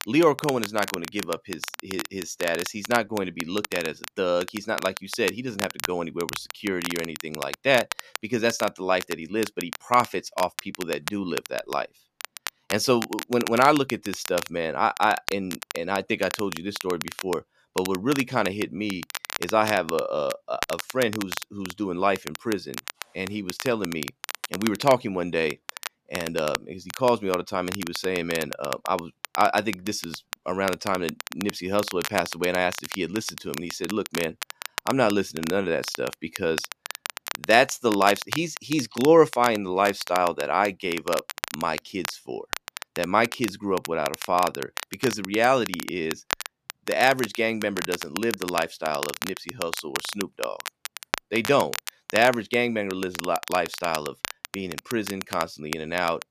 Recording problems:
crackle, like an old record; loud; 9 dB below the speech

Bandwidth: 14.5 kHz